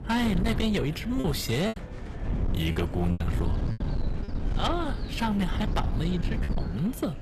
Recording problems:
distortion; slight; 10 dB below the speech
chatter from many people; noticeable; throughout; 20 dB below the speech
low rumble; noticeable; throughout; 10 dB below the speech
animal sounds; faint; throughout; 30 dB below the speech
choppy; very; 6% of the speech affected

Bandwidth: 14.5 kHz